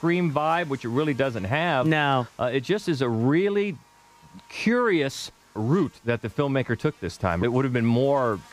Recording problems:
electrical hum; faint; throughout; 50 Hz, 25 dB below the speech

